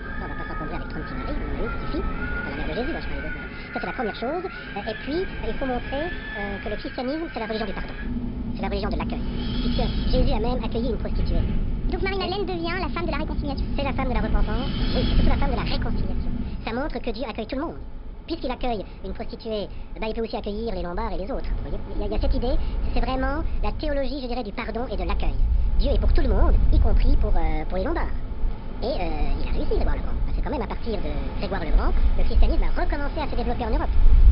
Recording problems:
wrong speed and pitch; too fast and too high; 1.5 times normal speed
high frequencies cut off; noticeable; nothing above 5.5 kHz
wind in the background; very loud; throughout; 2 dB above the speech
electrical hum; faint; throughout; 50 Hz, 30 dB below the speech

